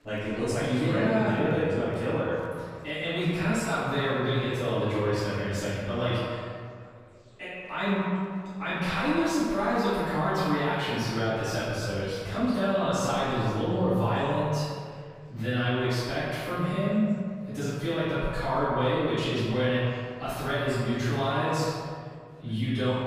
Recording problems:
echo of what is said; strong; throughout; 120 ms later, 10 dB below the speech
room echo; strong; dies away in 1.7 s
off-mic speech; far
murmuring crowd; faint; throughout; 30 dB below the speech

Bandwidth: 15 kHz